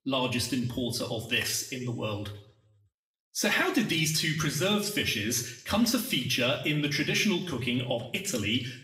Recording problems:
room echo; slight; dies away in 0.6 s
off-mic speech; somewhat distant

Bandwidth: 15.5 kHz